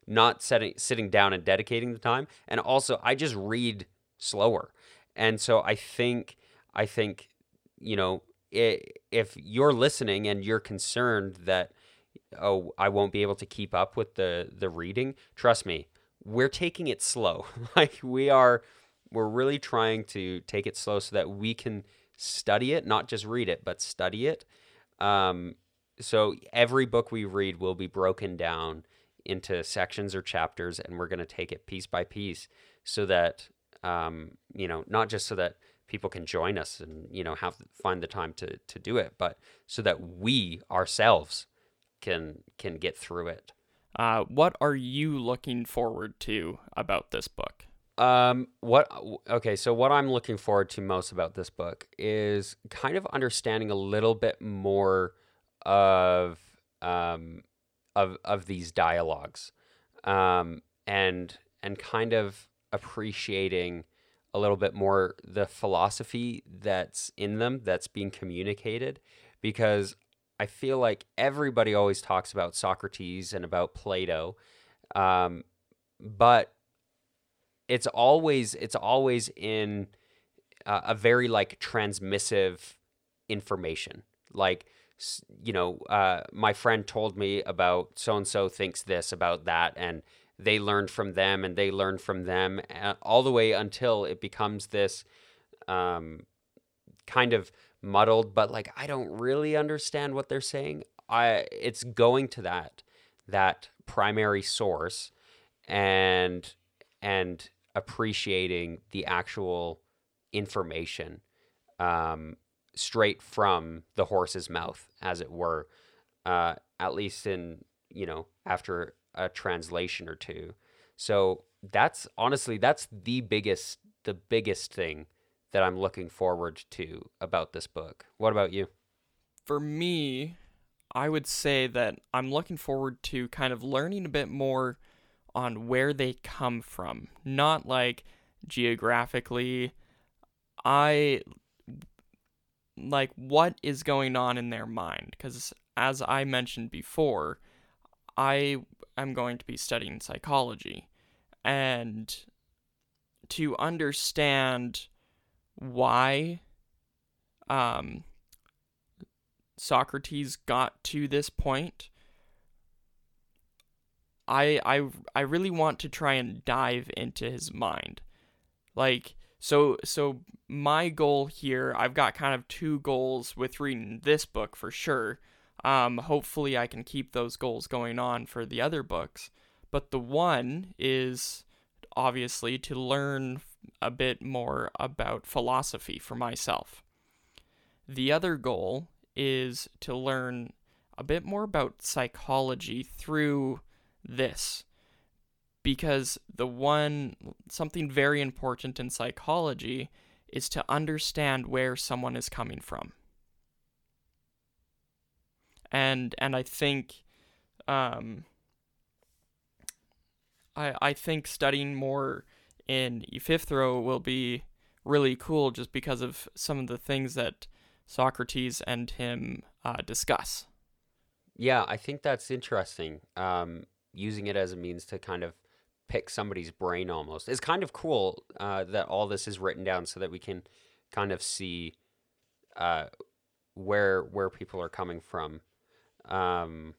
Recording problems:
none

